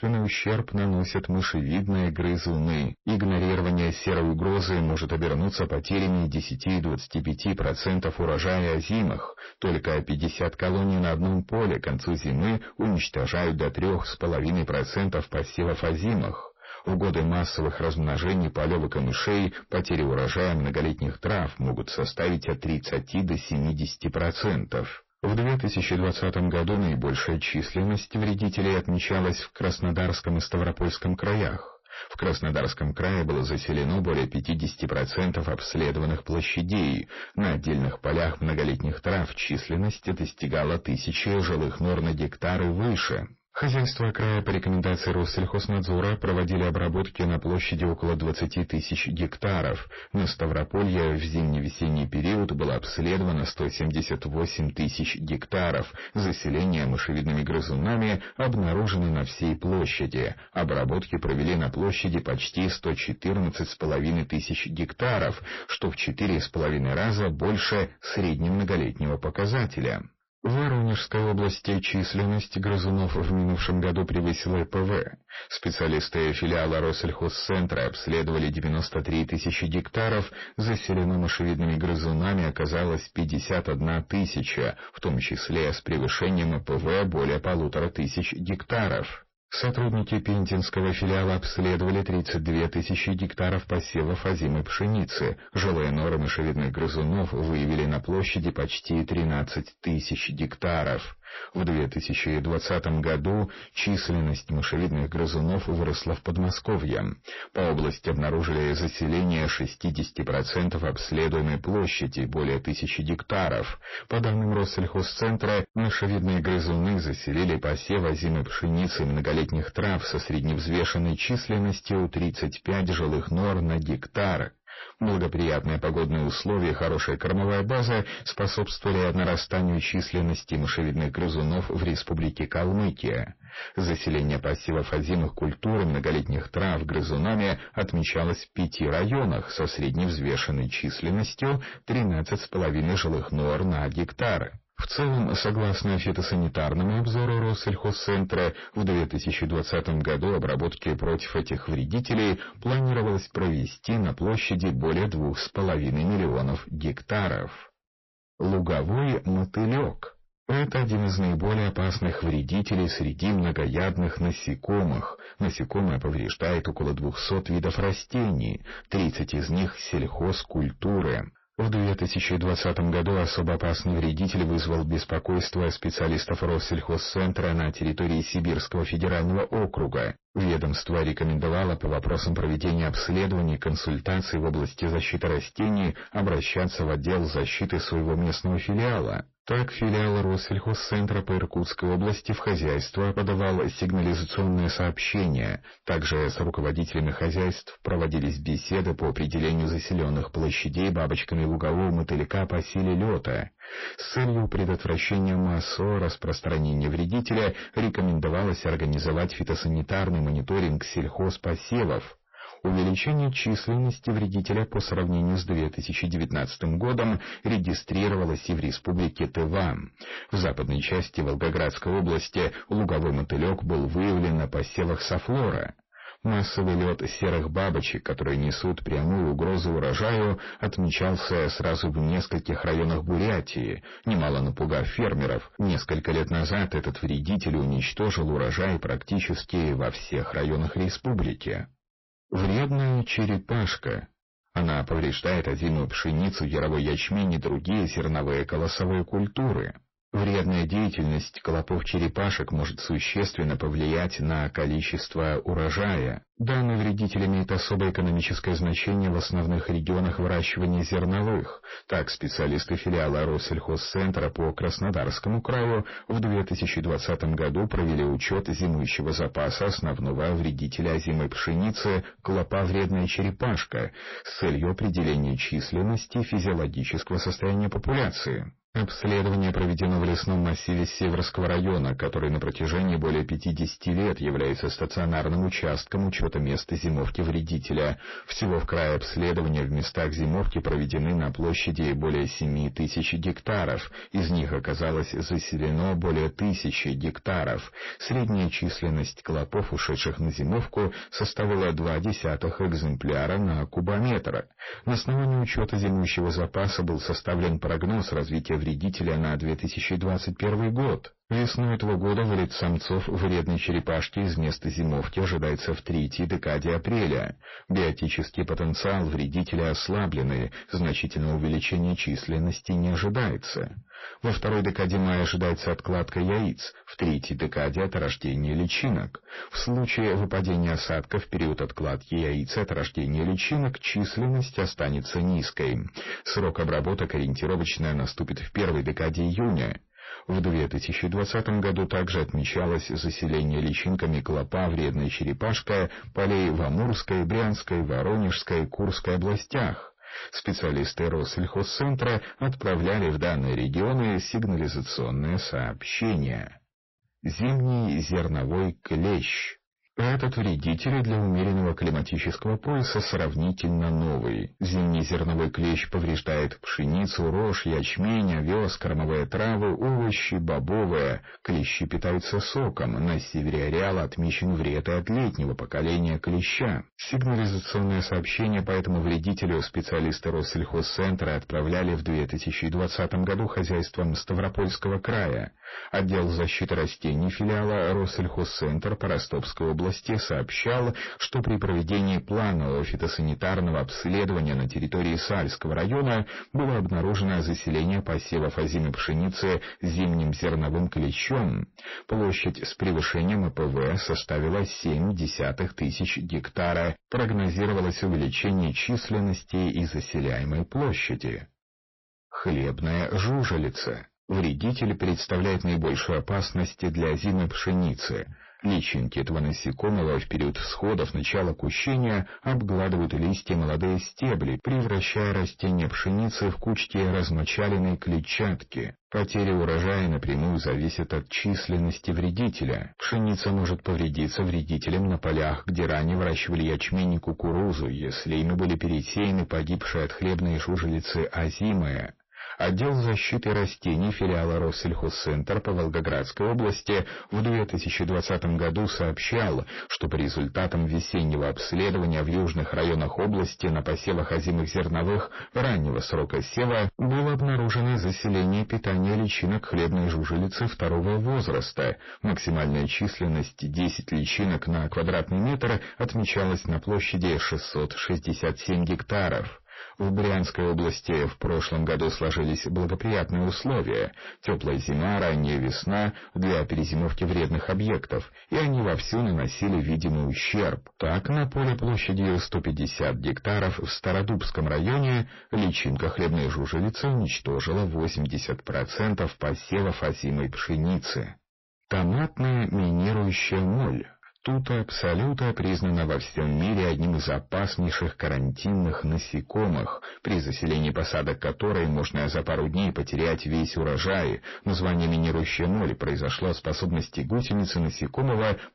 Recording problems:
distortion; heavy; 6 dB below the speech
garbled, watery; slightly; nothing above 5.5 kHz

